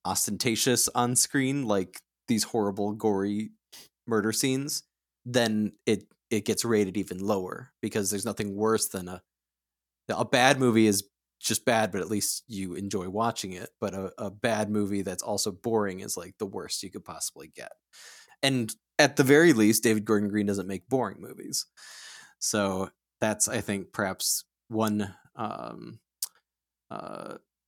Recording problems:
none

